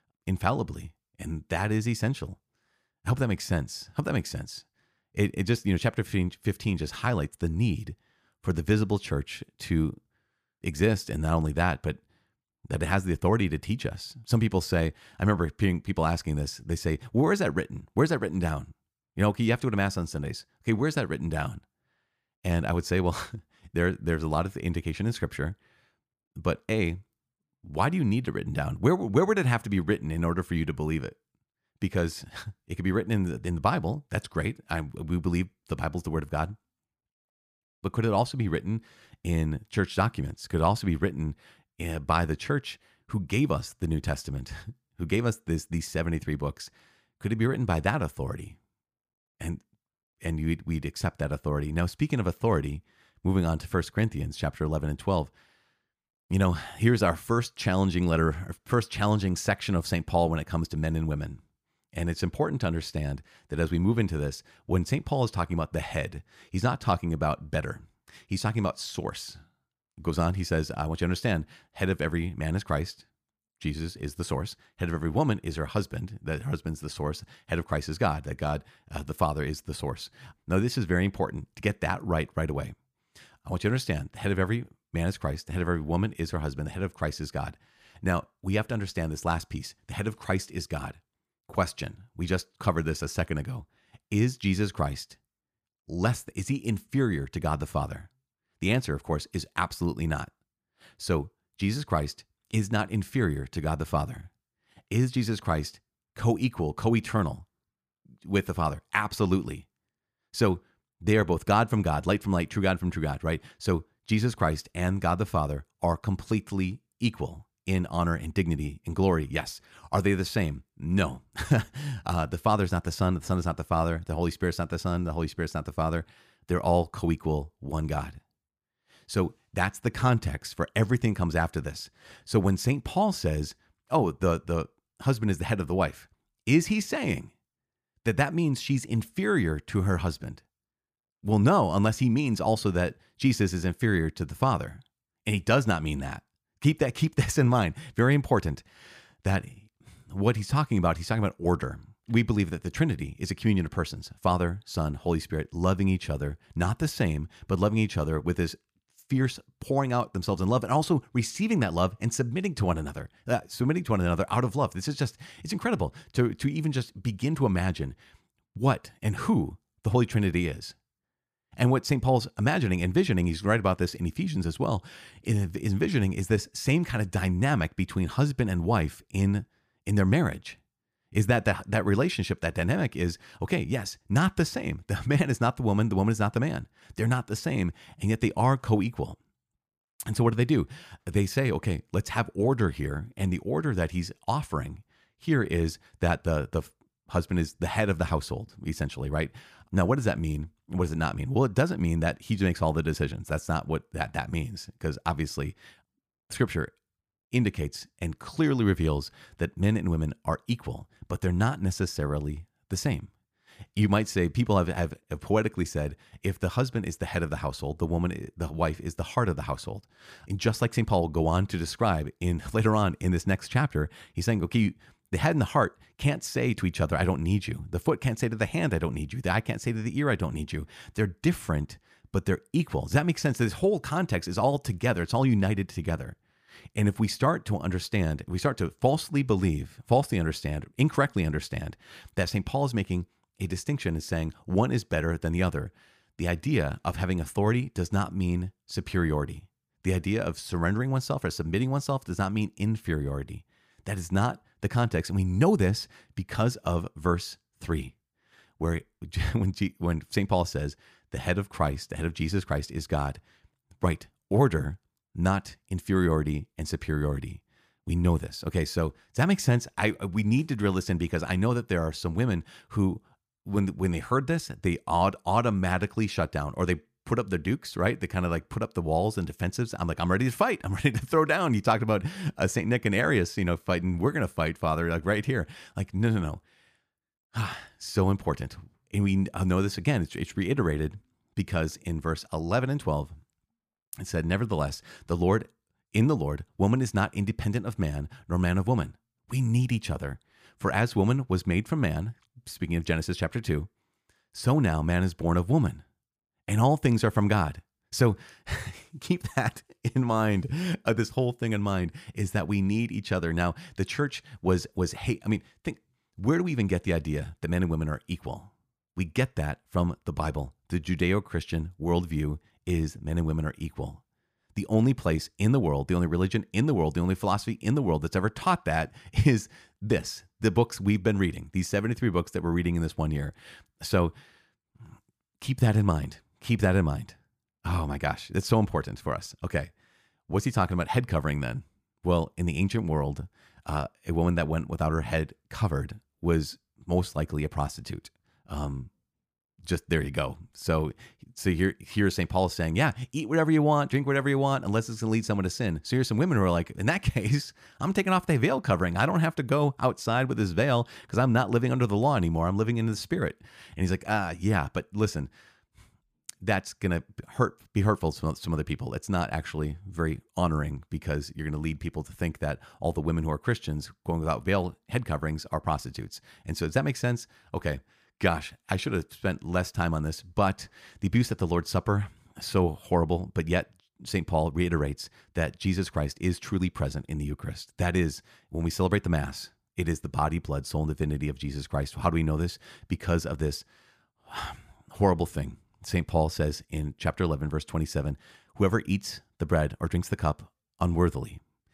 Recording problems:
none

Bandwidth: 15 kHz